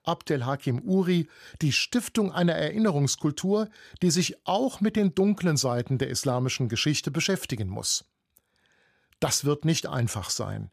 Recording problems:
none

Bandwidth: 15 kHz